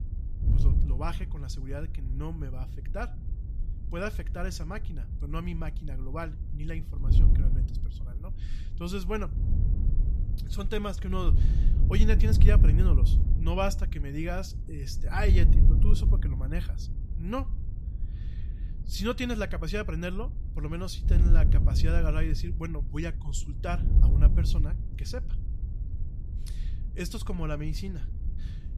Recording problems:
wind noise on the microphone; heavy; 9 dB below the speech

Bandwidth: 14.5 kHz